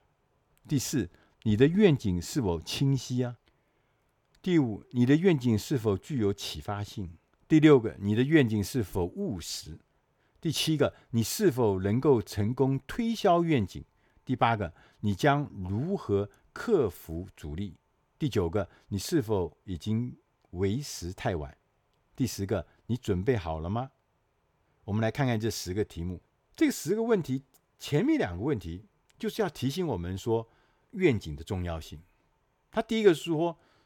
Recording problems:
none

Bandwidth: 18 kHz